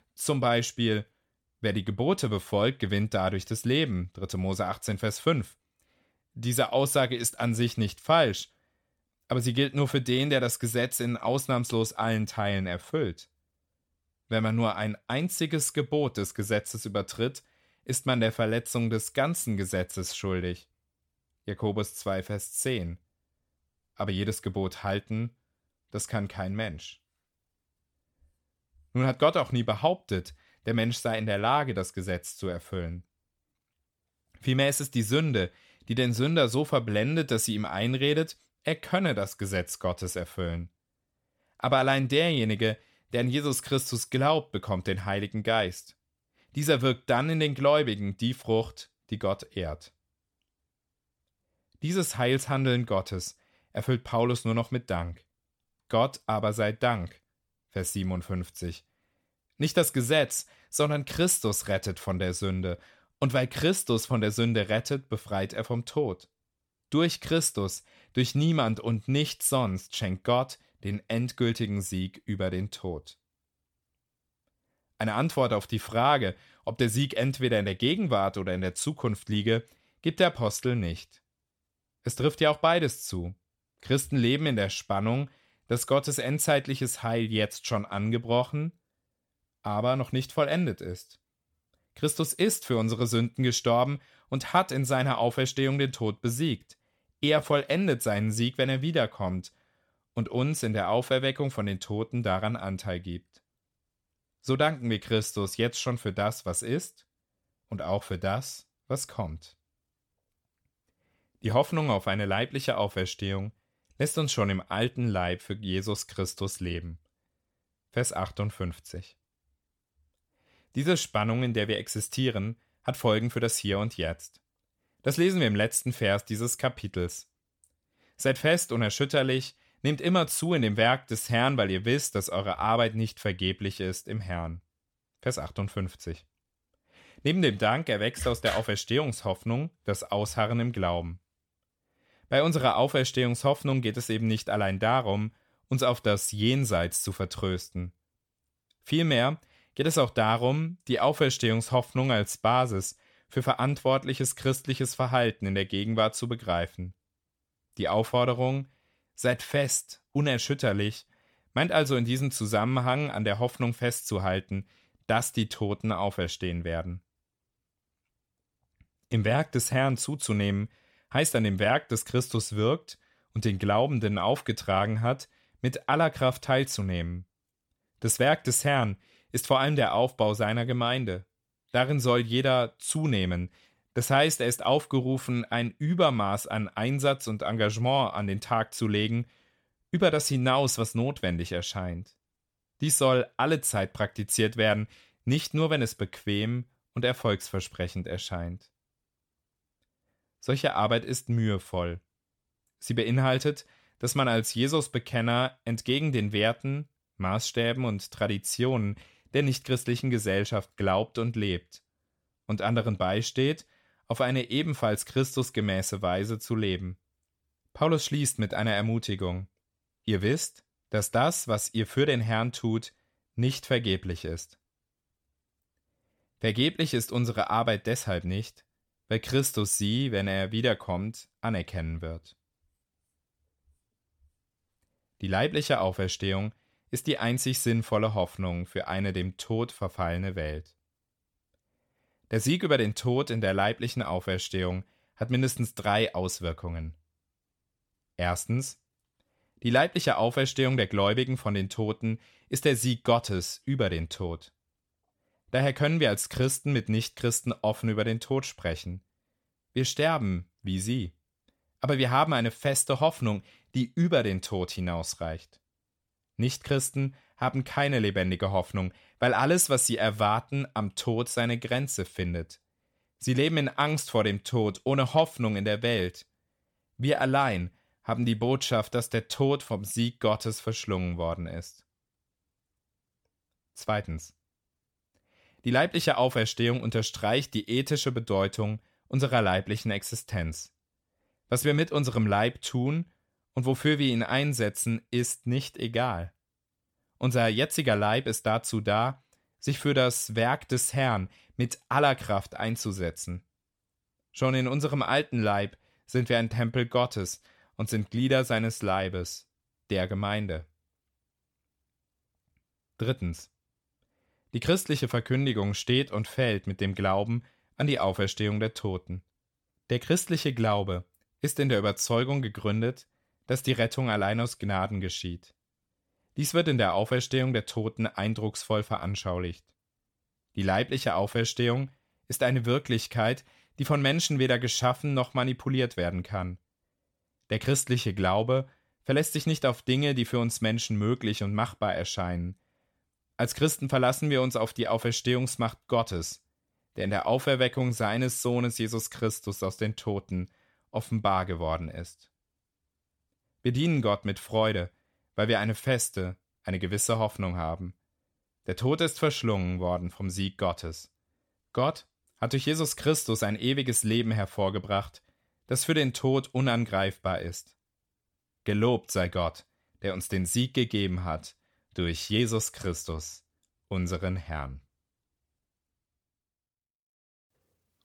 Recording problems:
none

